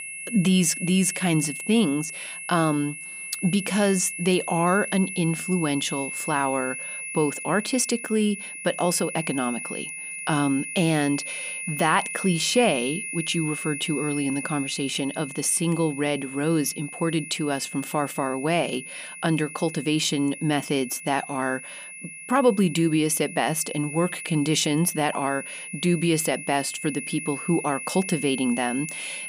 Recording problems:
high-pitched whine; loud; throughout; 2.5 kHz, 8 dB below the speech

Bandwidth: 15 kHz